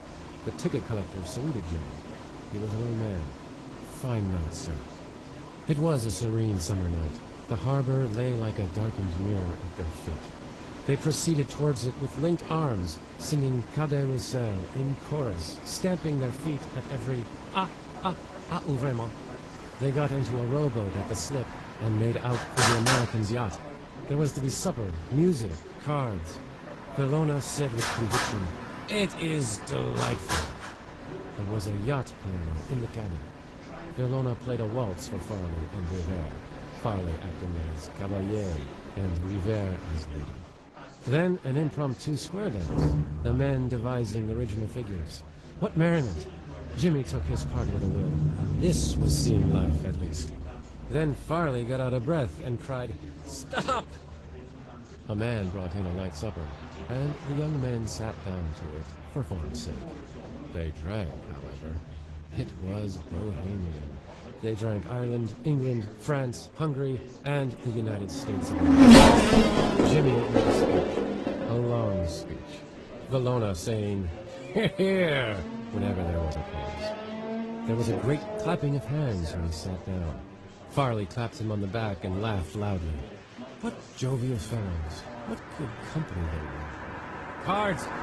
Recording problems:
garbled, watery; slightly
traffic noise; very loud; throughout; 4 dB above the speech
chatter from many people; noticeable; throughout; 15 dB below the speech

